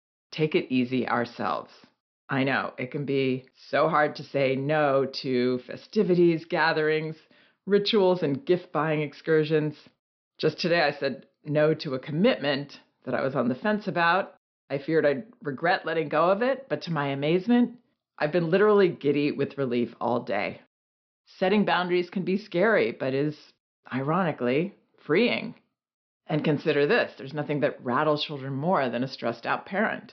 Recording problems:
high frequencies cut off; noticeable; nothing above 5.5 kHz

